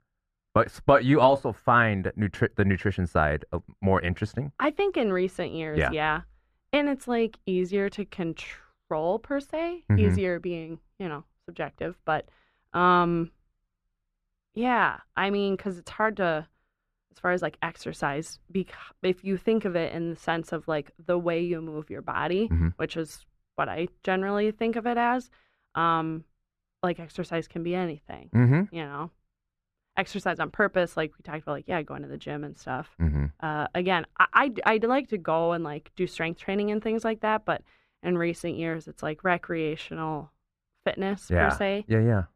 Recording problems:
muffled; very; fading above 3.5 kHz

